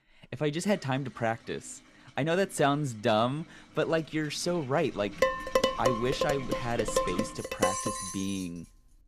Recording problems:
household noises; noticeable; throughout; 10 dB below the speech
clattering dishes; loud; from 5 to 8 s; peak 4 dB above the speech

